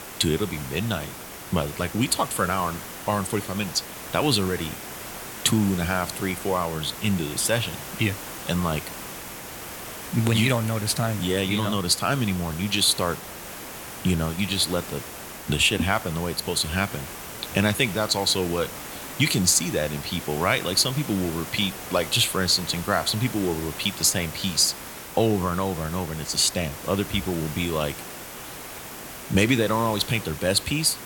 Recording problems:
hiss; noticeable; throughout; 10 dB below the speech

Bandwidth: 17.5 kHz